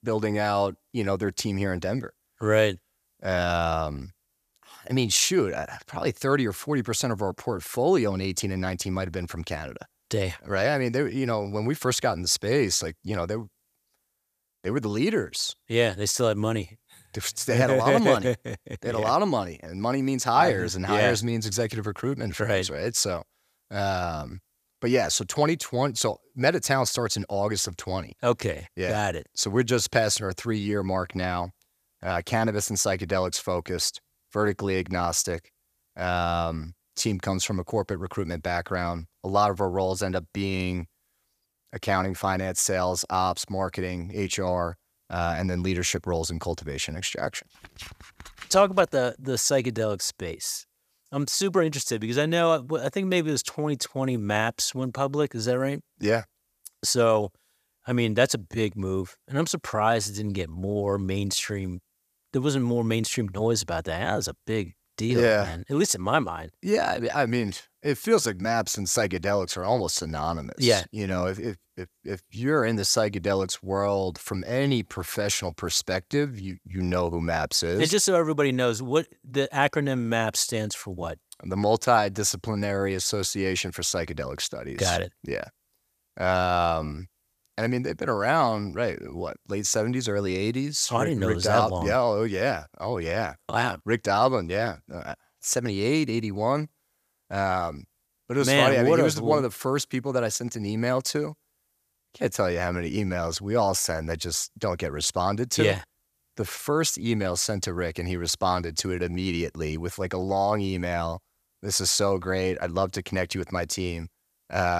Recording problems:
abrupt cut into speech; at the end

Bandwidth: 14.5 kHz